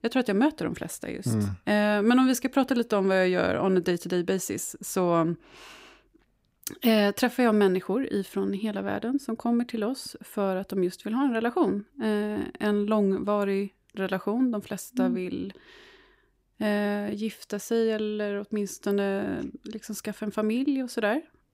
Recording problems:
none

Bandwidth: 15.5 kHz